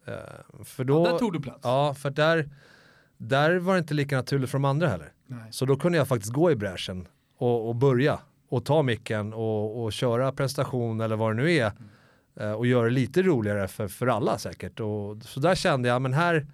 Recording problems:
none

